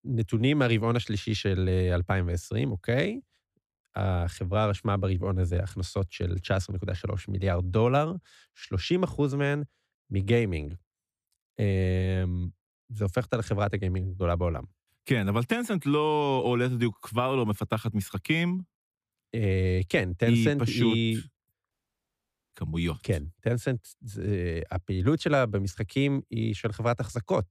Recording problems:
audio cutting out; at 22 s for 1 s

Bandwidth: 15 kHz